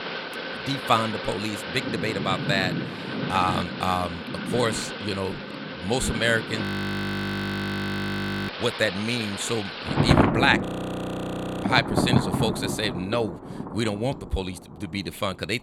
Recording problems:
rain or running water; loud; throughout; 1 dB below the speech
audio freezing; at 6.5 s for 2 s and at 11 s for 1 s

